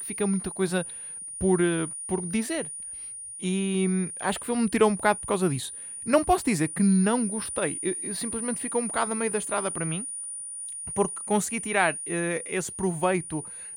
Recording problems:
high-pitched whine; loud; throughout; 9.5 kHz, 6 dB below the speech

